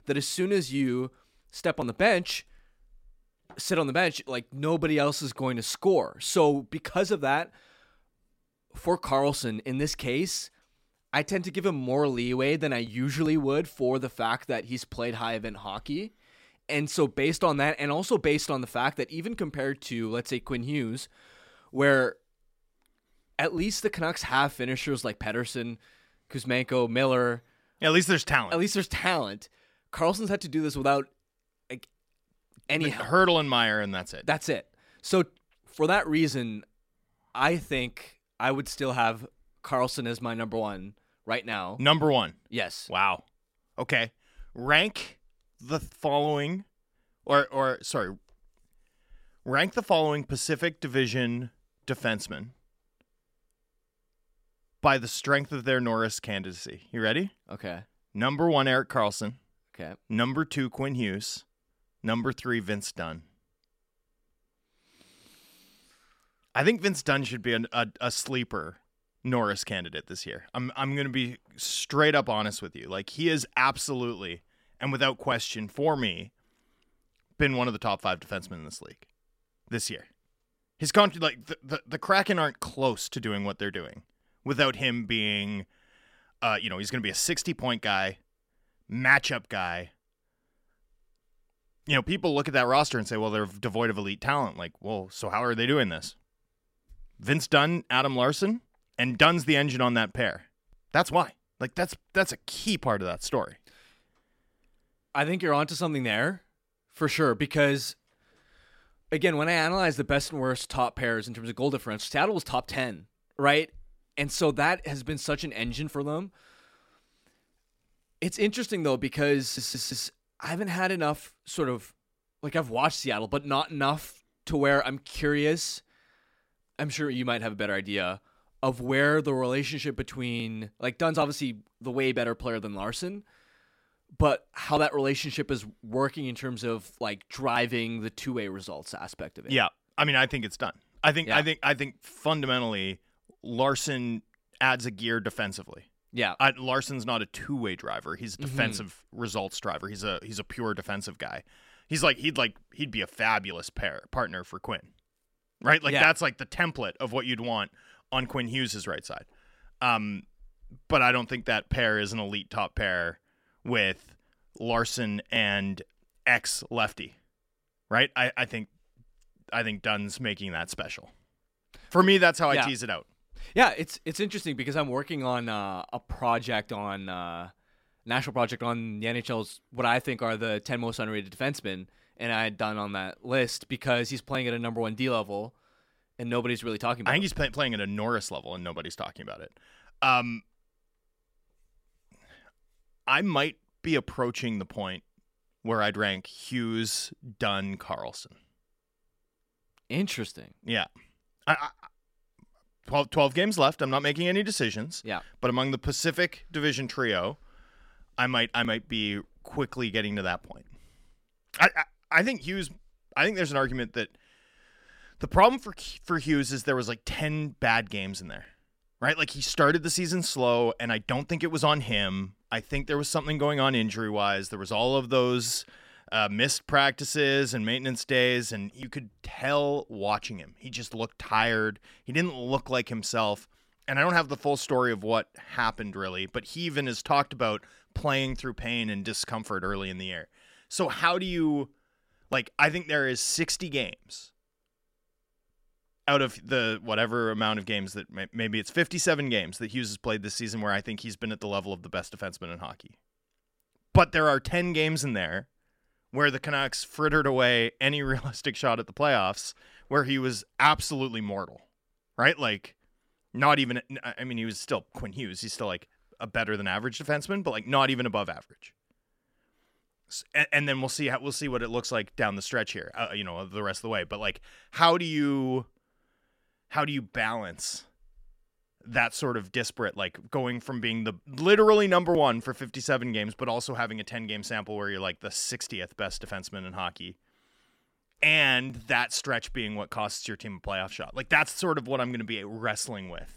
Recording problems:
audio stuttering; at 1:59

